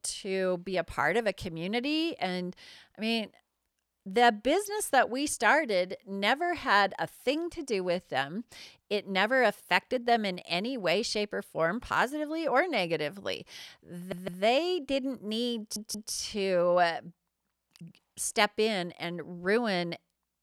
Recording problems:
audio stuttering; at 14 s and at 16 s

